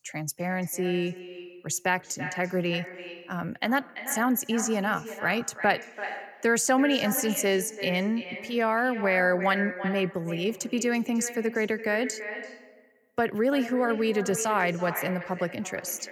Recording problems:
echo of what is said; strong; throughout; 340 ms later, 10 dB below the speech

